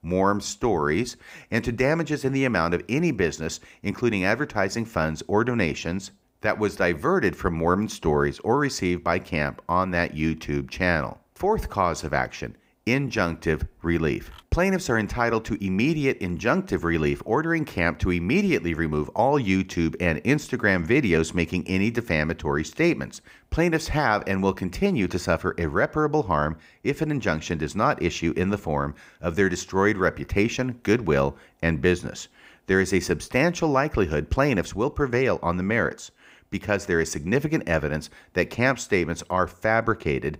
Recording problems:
none

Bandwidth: 15.5 kHz